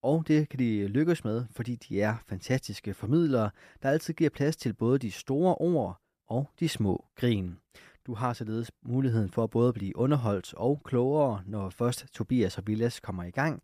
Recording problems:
none

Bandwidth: 14.5 kHz